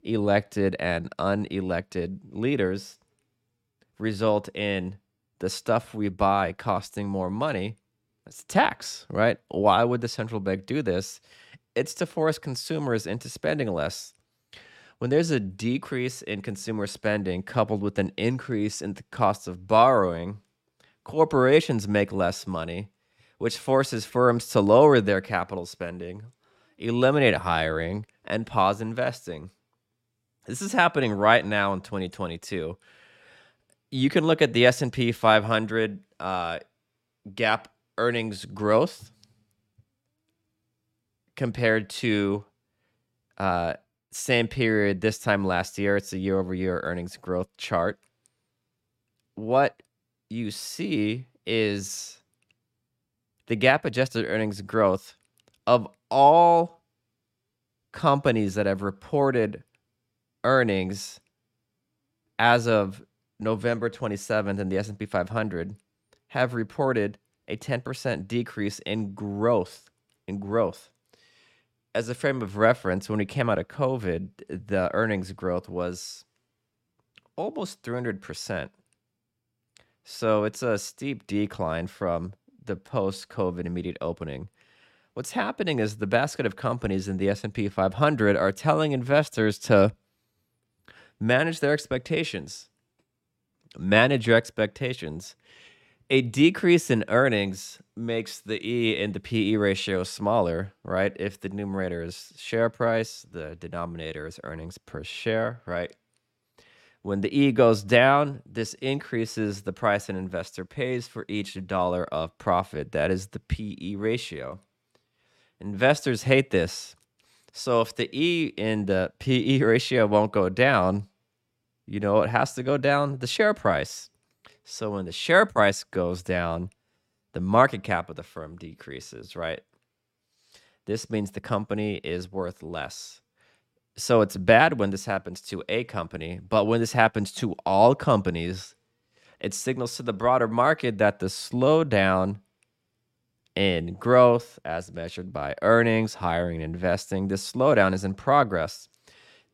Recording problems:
none

